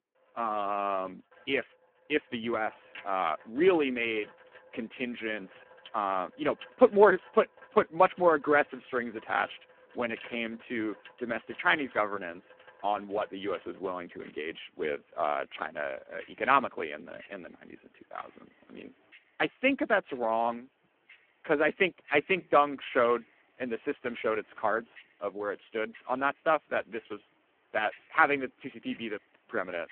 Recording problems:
phone-call audio; poor line
household noises; faint; throughout; 25 dB below the speech

